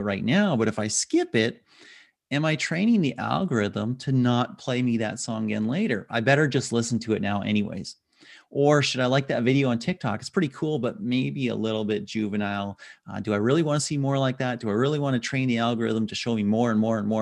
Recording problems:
abrupt cut into speech; at the start and the end

